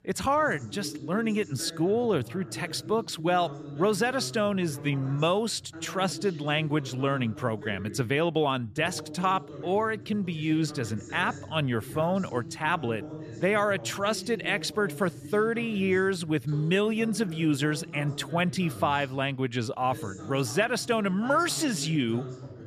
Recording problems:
voice in the background; noticeable; throughout; 15 dB below the speech

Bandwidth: 14.5 kHz